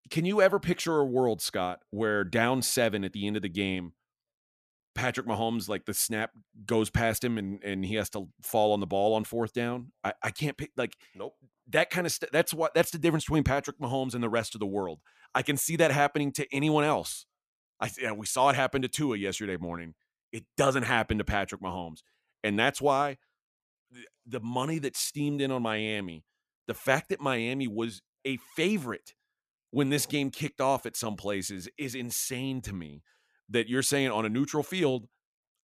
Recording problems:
none

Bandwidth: 14.5 kHz